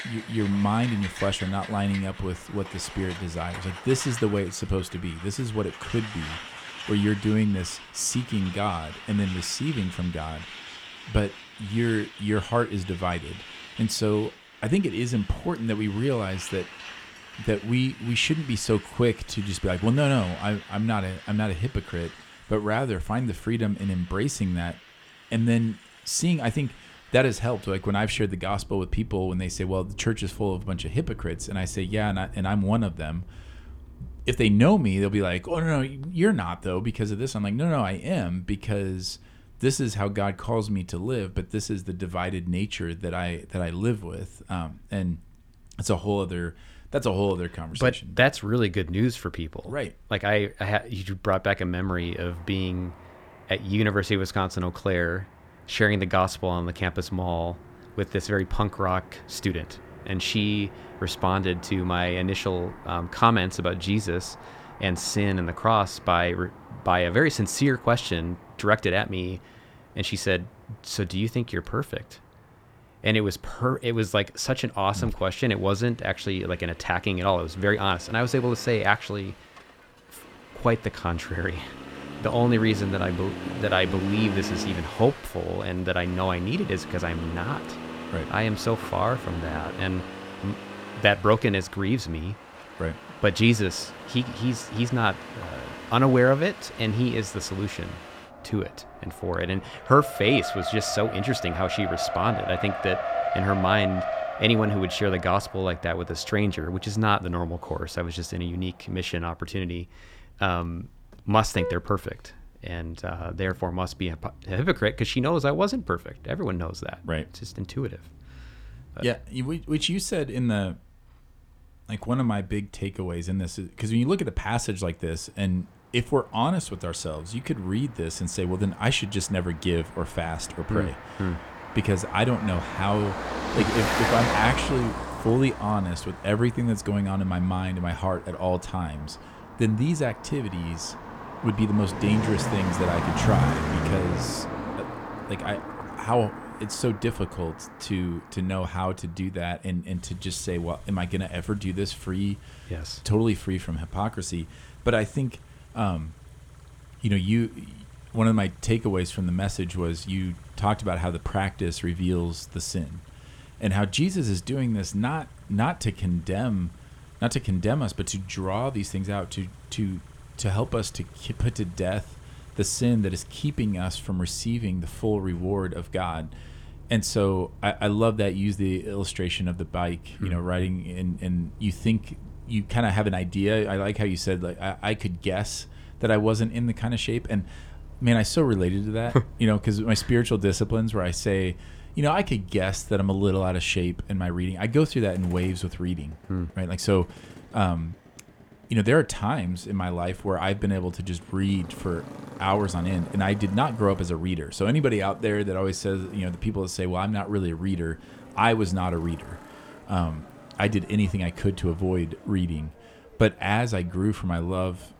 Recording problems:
traffic noise; noticeable; throughout; 10 dB below the speech

